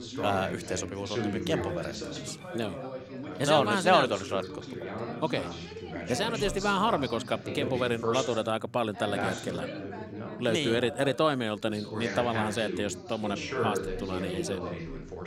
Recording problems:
background chatter; loud; throughout; 3 voices, 6 dB below the speech

